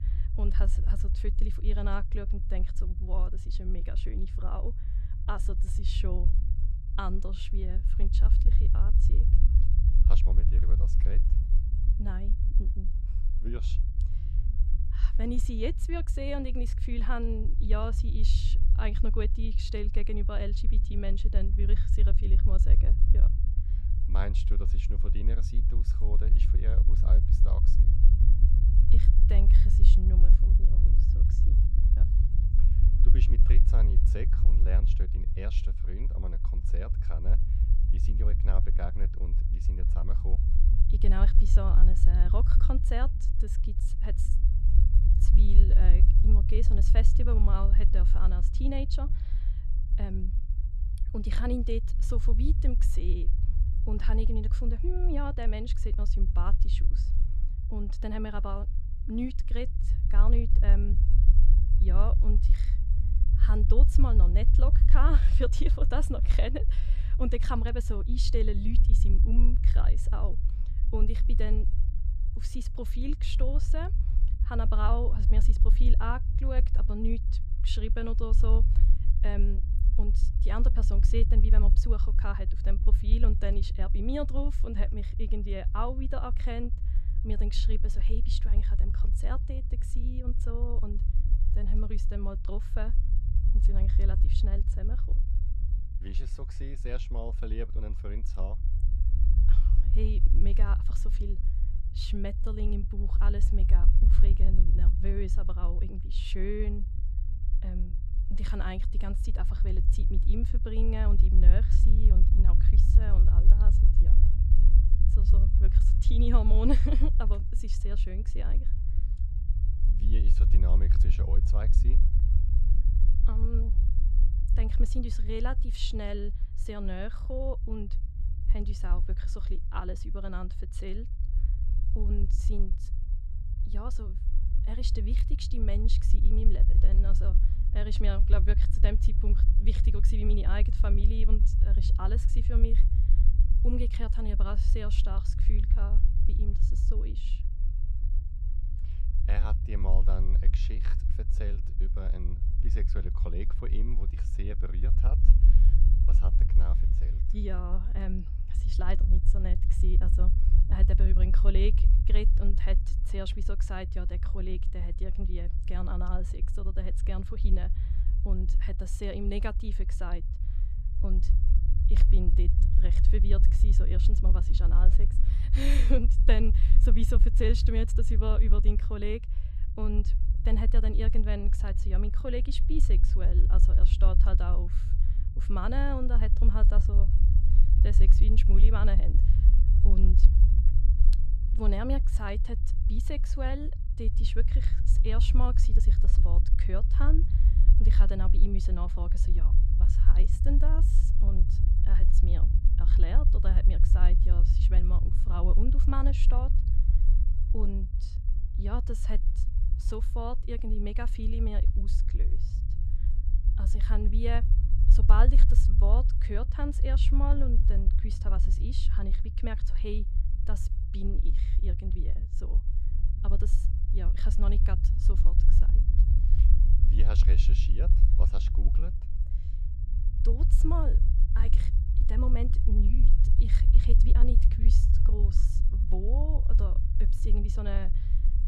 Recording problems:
low rumble; loud; throughout; 7 dB below the speech

